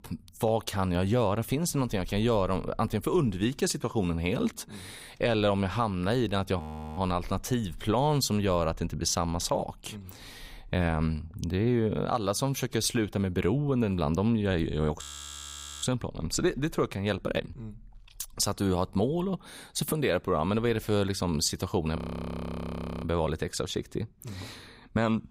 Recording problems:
audio freezing; at 6.5 s, at 15 s for 1 s and at 22 s for 1 s

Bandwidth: 15.5 kHz